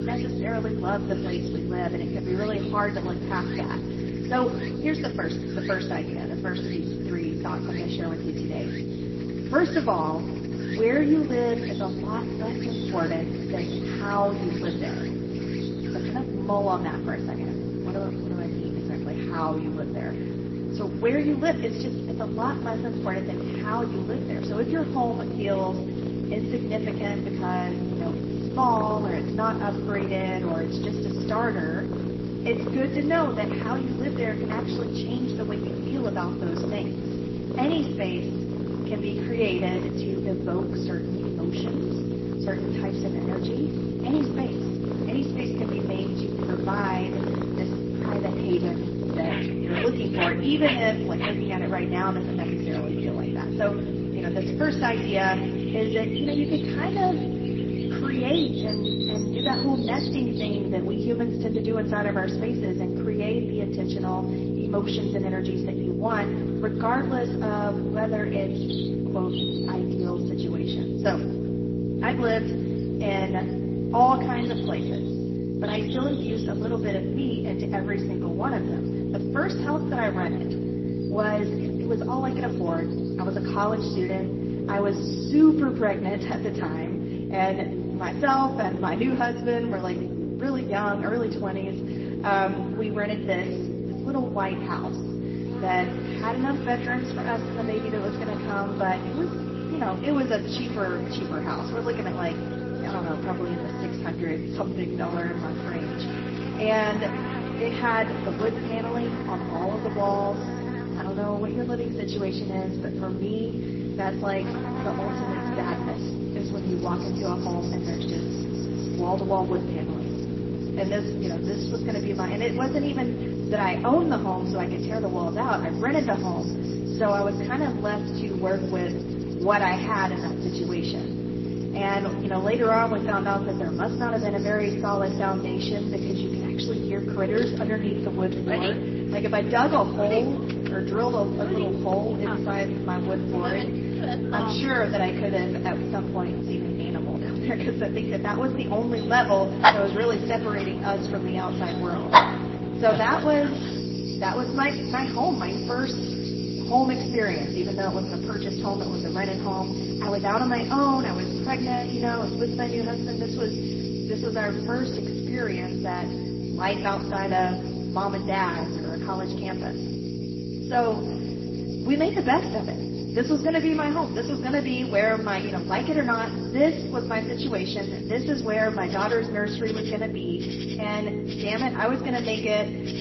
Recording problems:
room echo; slight; dies away in 2.1 s
off-mic speech; somewhat distant
garbled, watery; slightly; nothing above 5.5 kHz
electrical hum; loud; throughout; 60 Hz, 7 dB below the speech
animal sounds; loud; throughout; 8 dB below the speech

